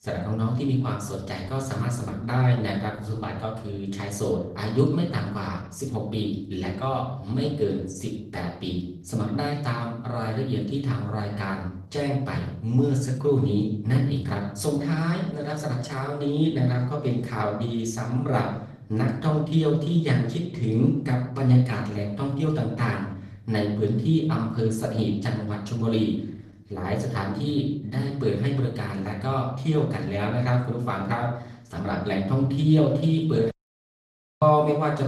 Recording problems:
off-mic speech; far
room echo; slight; dies away in 0.7 s
garbled, watery; slightly; nothing above 14 kHz
audio cutting out; at 34 s for 1 s

